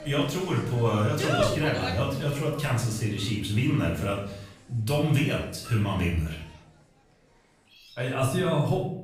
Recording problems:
off-mic speech; far
room echo; noticeable; dies away in 0.6 s
animal sounds; loud; throughout; 7 dB below the speech

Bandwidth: 15 kHz